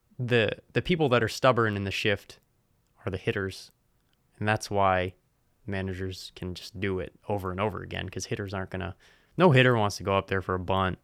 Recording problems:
none

